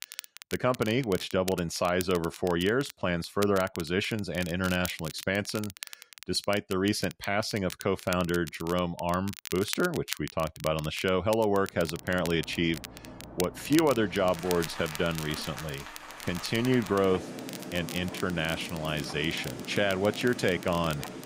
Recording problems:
rain or running water; noticeable; from 12 s on; 15 dB below the speech
crackle, like an old record; noticeable; 15 dB below the speech
household noises; faint; from 14 s on; 25 dB below the speech

